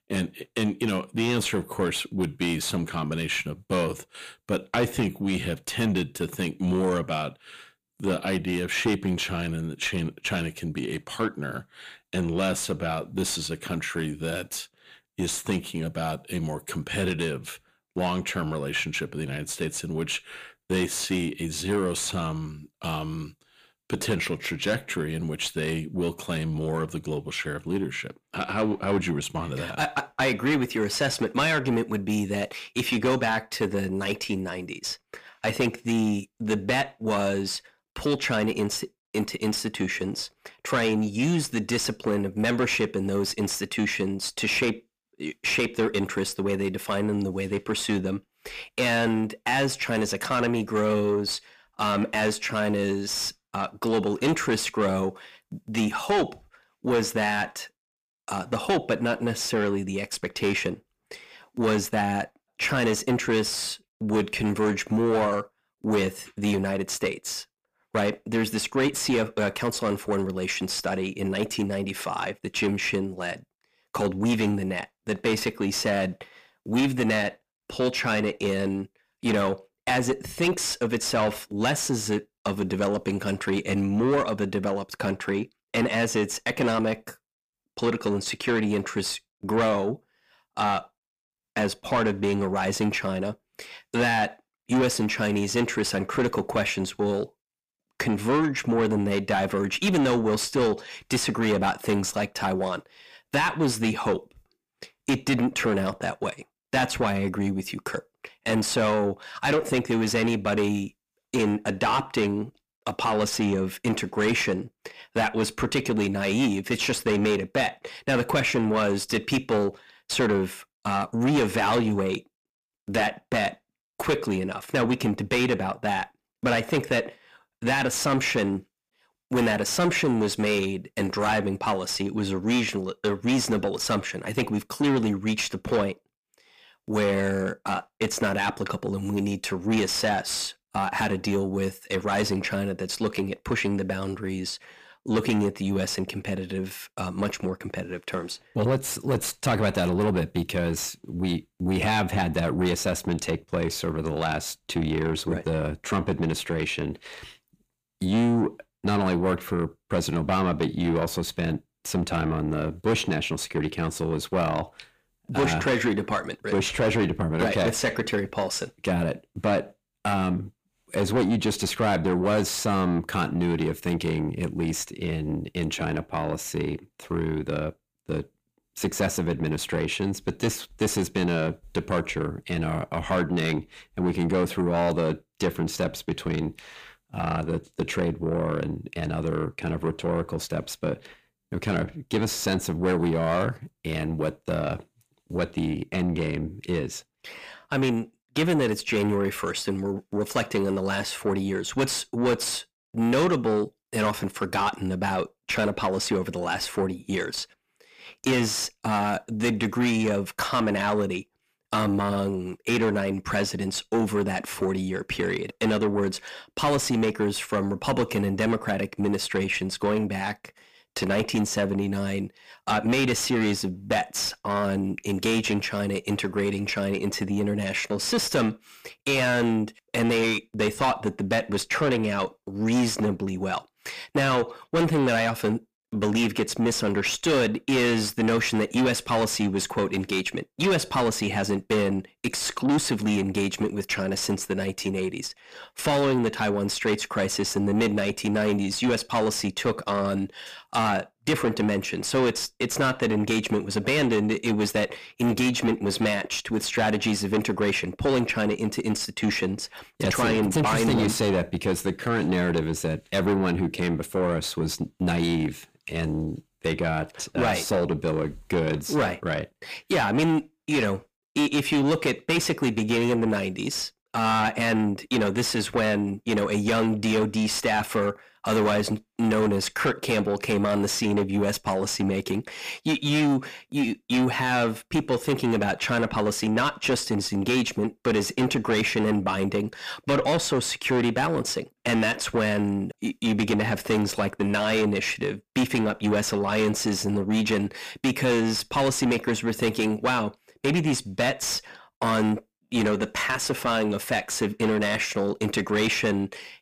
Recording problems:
distortion; heavy; 6 dB below the speech

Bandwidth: 15 kHz